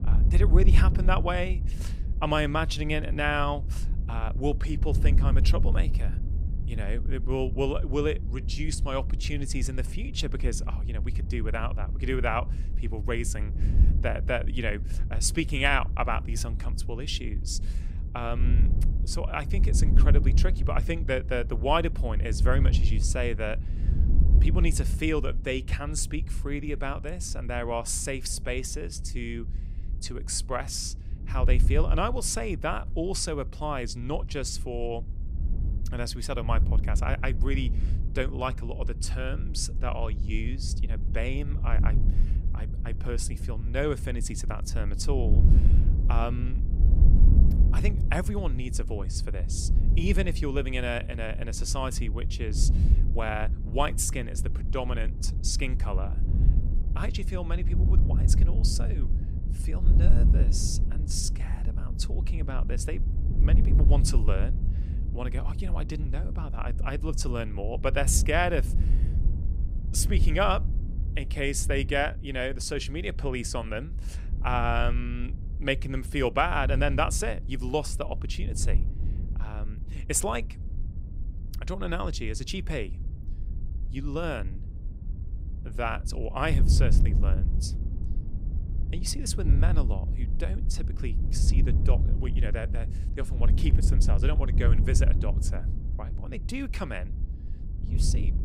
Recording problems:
wind noise on the microphone; occasional gusts; 15 dB below the speech

